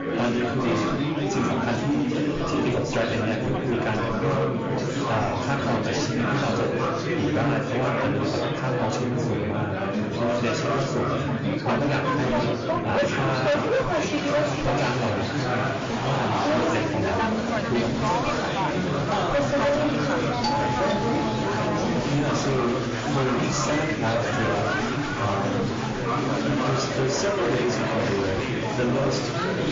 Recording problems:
room echo; slight; dies away in 0.5 s
distortion; slight; 14% of the sound clipped
off-mic speech; somewhat distant
garbled, watery; slightly; nothing above 6.5 kHz
chatter from many people; very loud; throughout; 3 dB above the speech
background music; noticeable; throughout; 20 dB below the speech
clattering dishes; faint; at 14 s; peak 10 dB below the speech
doorbell; loud; from 20 to 22 s; peak 2 dB above the speech
dog barking; noticeable; at 26 s; peak 9 dB below the speech

